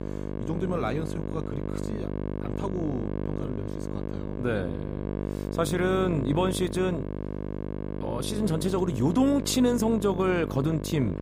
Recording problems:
electrical hum; loud; throughout; 50 Hz, 8 dB below the speech

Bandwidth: 15.5 kHz